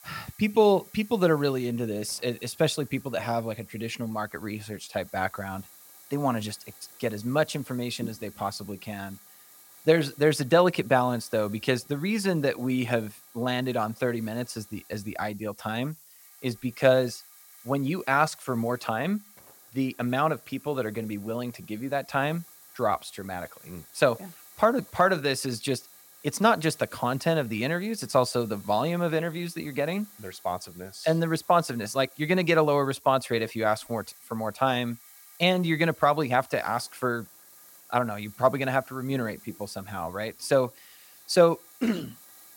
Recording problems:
hiss; faint; throughout; 20 dB below the speech

